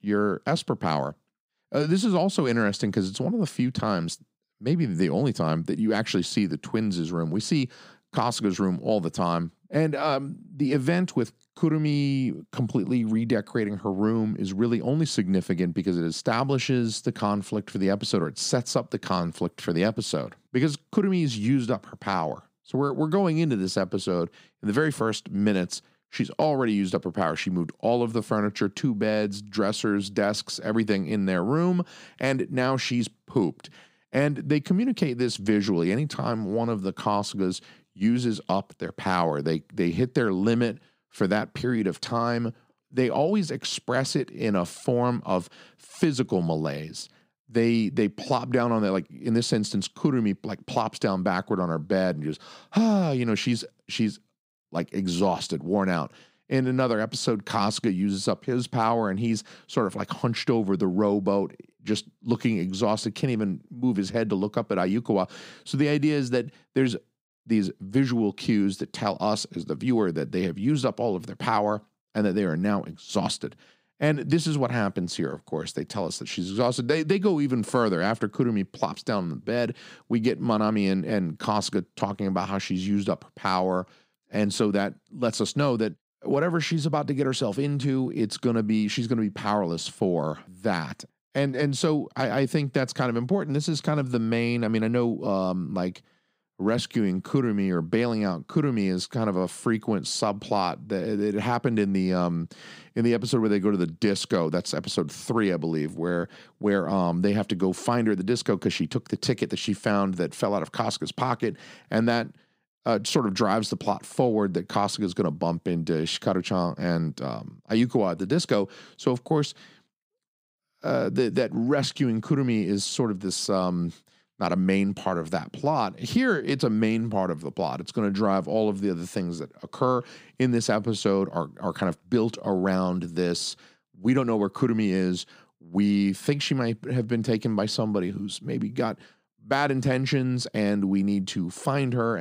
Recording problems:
abrupt cut into speech; at the end

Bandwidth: 15.5 kHz